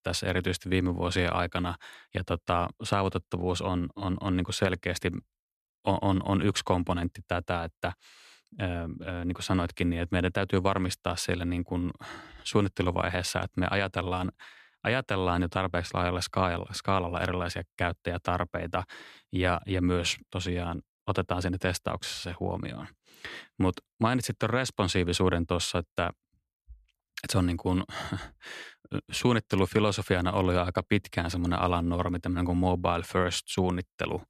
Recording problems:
none

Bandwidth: 14 kHz